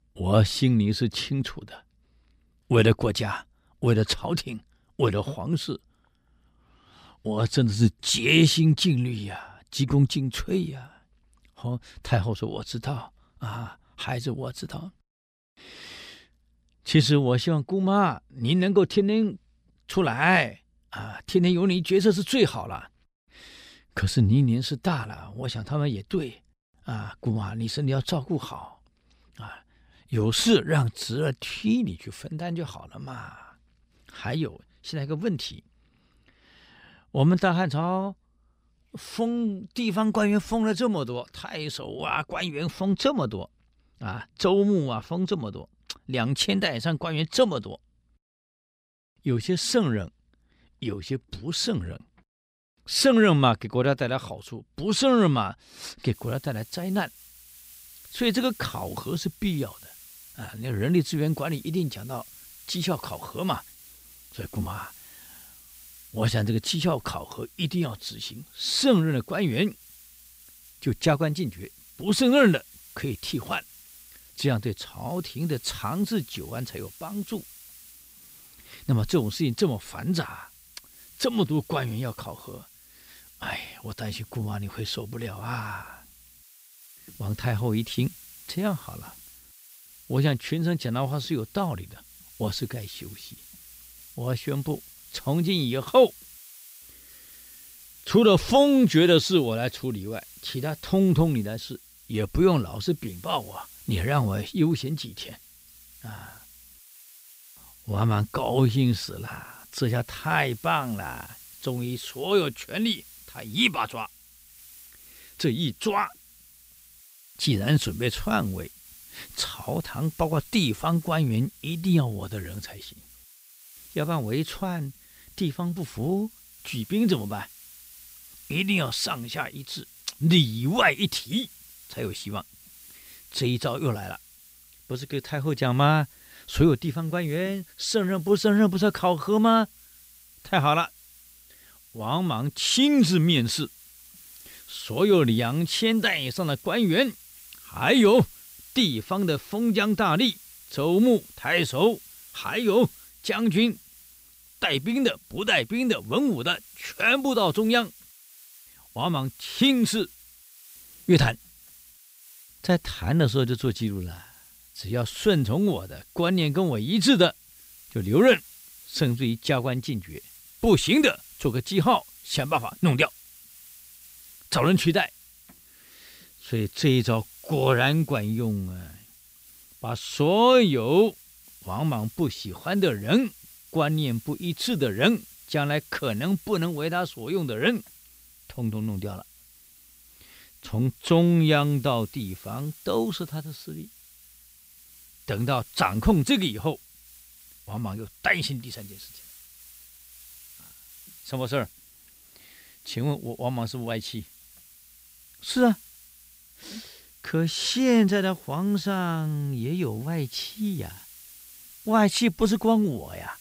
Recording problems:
hiss; faint; from 56 s on; 20 dB below the speech

